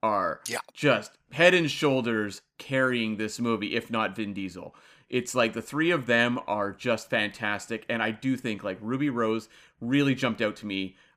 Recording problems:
none

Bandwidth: 15 kHz